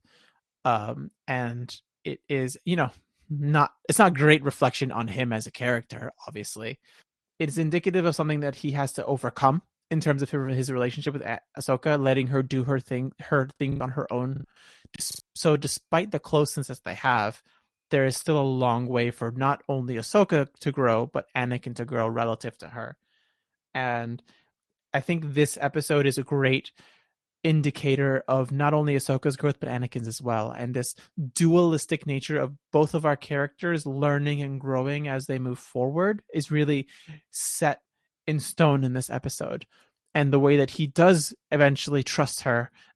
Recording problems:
garbled, watery; slightly; nothing above 11.5 kHz
choppy; very; from 14 to 15 s; 9% of the speech affected

